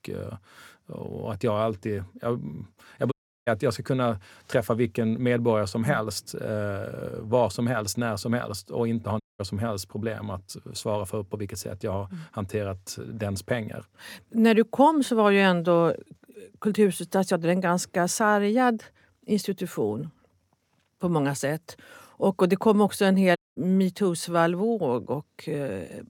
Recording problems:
audio cutting out; at 3 s, at 9 s and at 23 s

